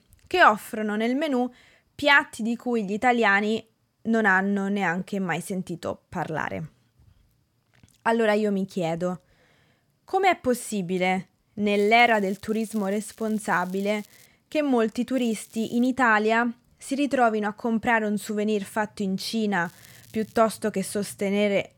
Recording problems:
crackling; faint; from 12 to 14 s, at 15 s and at 20 s; 25 dB below the speech

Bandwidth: 17 kHz